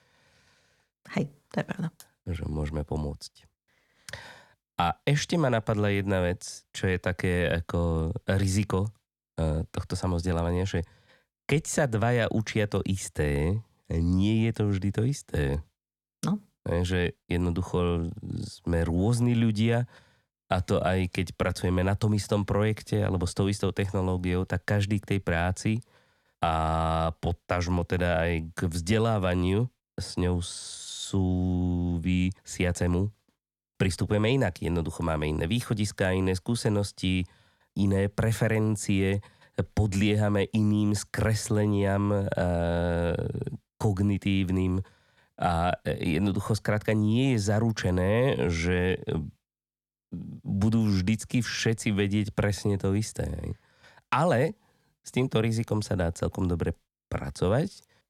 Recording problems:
none

